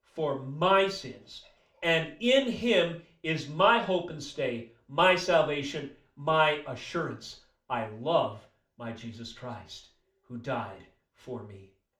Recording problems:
room echo; slight; dies away in 0.3 s
off-mic speech; somewhat distant

